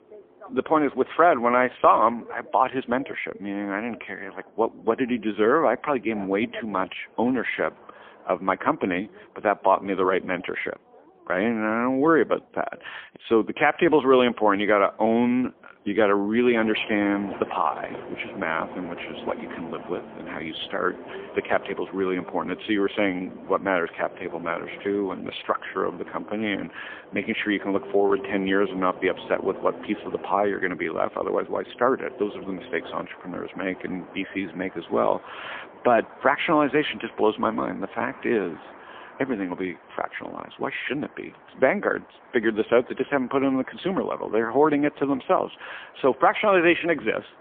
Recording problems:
phone-call audio; poor line; nothing above 3.5 kHz
traffic noise; noticeable; throughout; 20 dB below the speech

